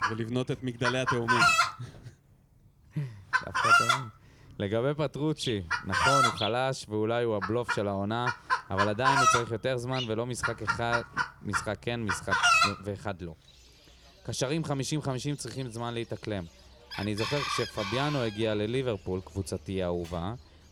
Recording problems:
animal sounds; very loud; throughout; 5 dB above the speech

